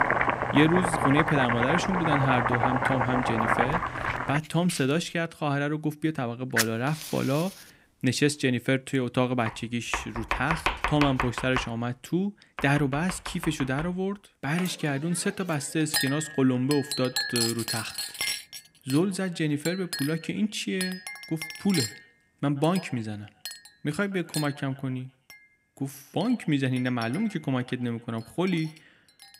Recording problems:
echo of what is said; faint; from 16 s on; 130 ms later, 25 dB below the speech
household noises; loud; throughout; 2 dB below the speech

